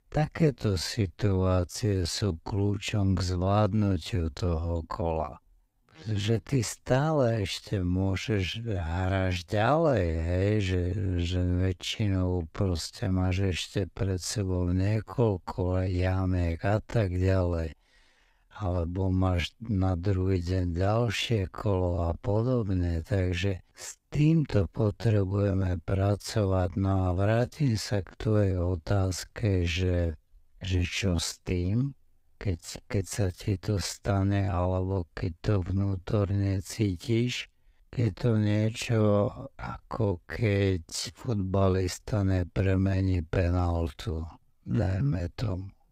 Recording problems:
wrong speed, natural pitch; too slow; 0.6 times normal speed

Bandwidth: 15.5 kHz